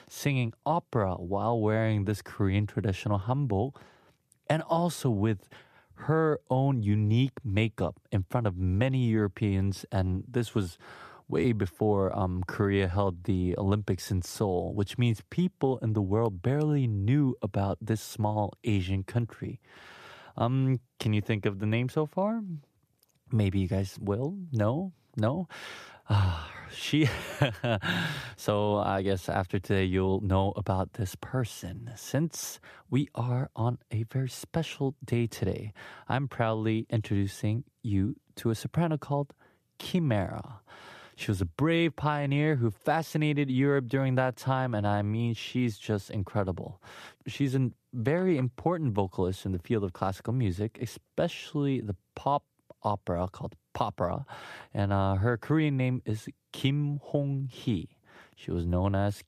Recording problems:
none

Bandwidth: 14.5 kHz